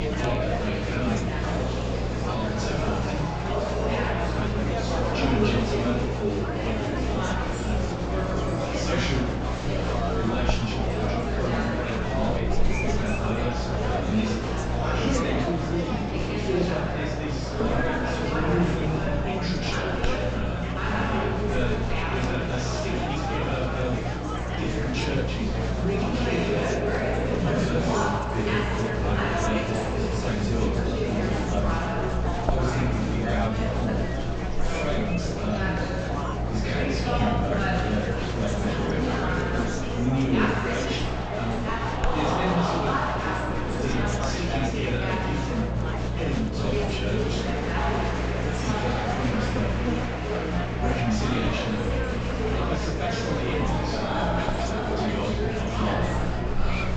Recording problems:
room echo; strong; dies away in 2 s
off-mic speech; far
high frequencies cut off; noticeable; nothing above 8 kHz
echo of what is said; faint; throughout; 240 ms later, 25 dB below the speech
murmuring crowd; very loud; throughout; 4 dB above the speech
electrical hum; loud; throughout; 60 Hz, 6 dB below the speech

